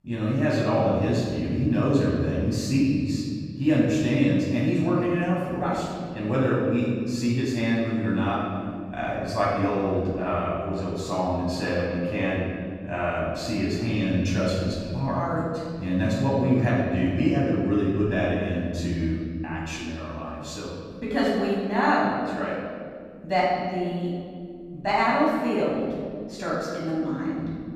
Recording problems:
room echo; strong; dies away in 2 s
off-mic speech; far

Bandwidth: 15.5 kHz